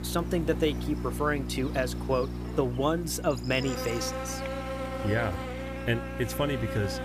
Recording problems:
electrical hum; loud; throughout; 60 Hz, 7 dB below the speech

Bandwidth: 15 kHz